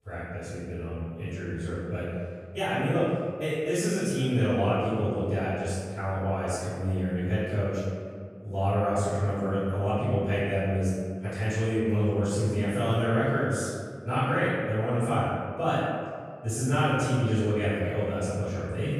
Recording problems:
room echo; strong; dies away in 1.8 s
off-mic speech; far

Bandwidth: 15 kHz